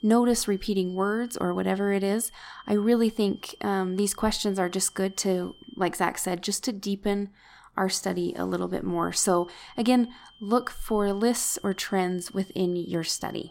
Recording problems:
high-pitched whine; faint; until 6 s and from 9 s on; 3 kHz, 25 dB below the speech

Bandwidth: 16.5 kHz